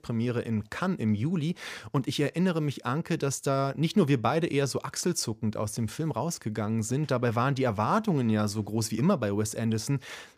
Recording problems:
none

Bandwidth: 15 kHz